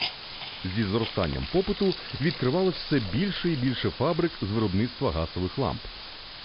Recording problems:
high frequencies cut off; noticeable; nothing above 5 kHz
hiss; loud; throughout; 9 dB below the speech

